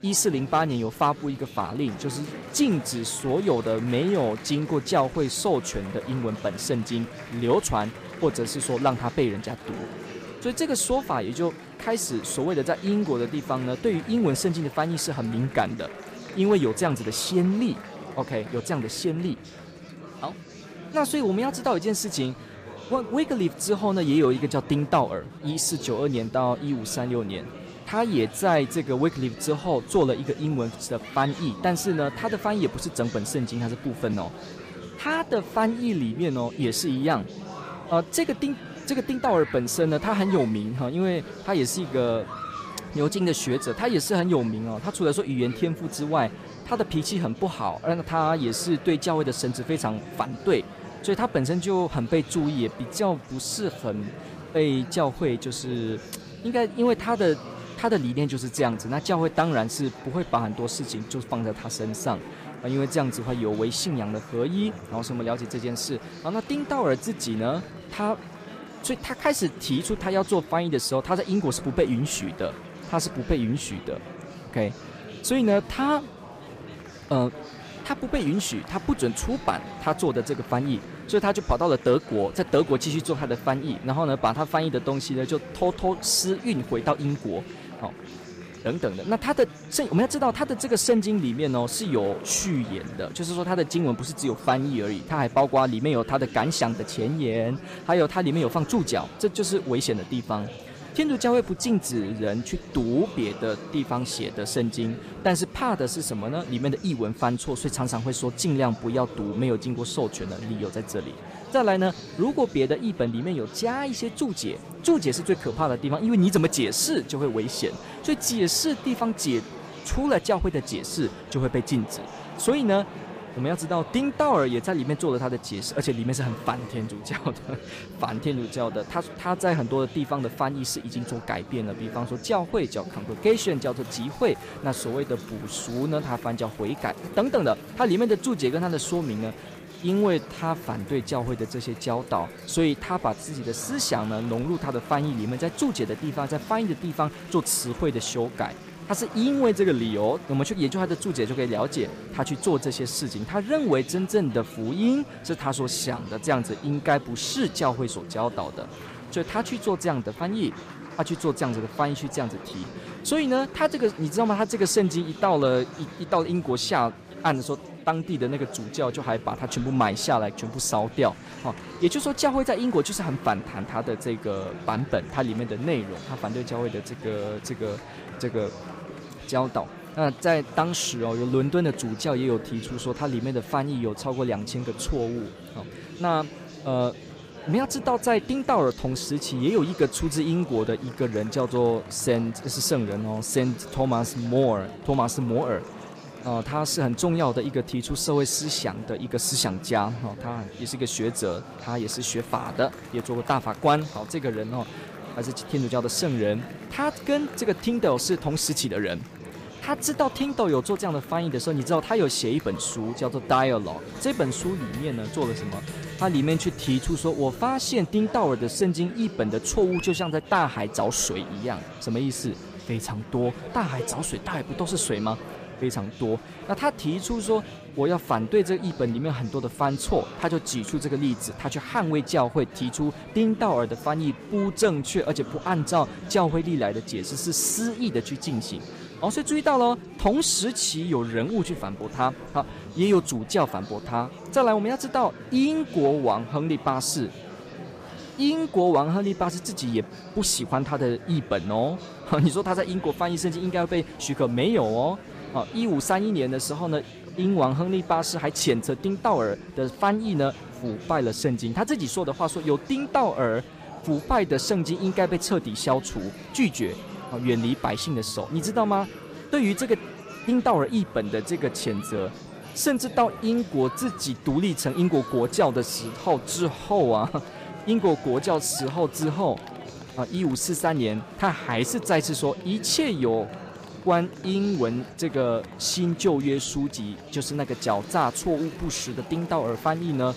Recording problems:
chatter from many people; noticeable; throughout; 15 dB below the speech

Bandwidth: 15 kHz